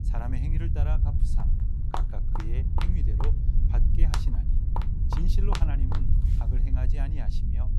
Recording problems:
low rumble; loud; throughout; 1 dB below the speech
footsteps; loud; from 1 to 6.5 s; peak 4 dB above the speech

